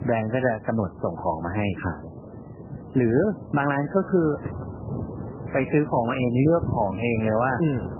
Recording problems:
garbled, watery; badly; nothing above 3 kHz
wind noise on the microphone; occasional gusts; 15 dB below the speech
uneven, jittery; strongly; from 0.5 to 7 s

